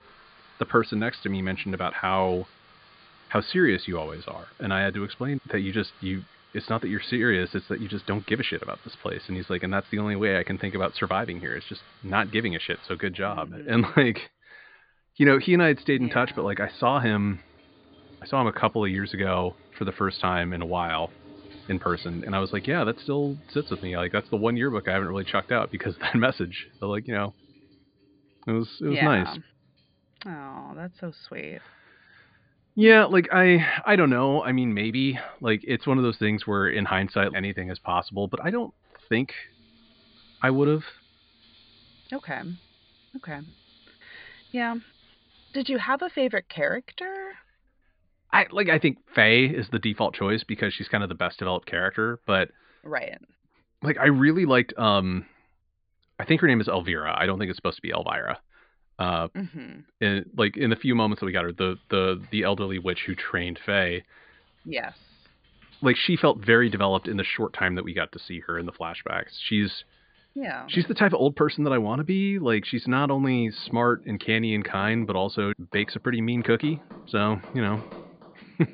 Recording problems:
high frequencies cut off; severe; nothing above 5 kHz
household noises; faint; throughout; 25 dB below the speech

